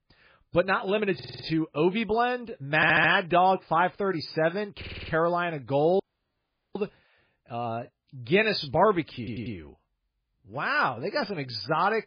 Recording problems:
garbled, watery; badly; nothing above 5 kHz
audio stuttering; 4 times, first at 1 s
audio cutting out; at 6 s for 1 s

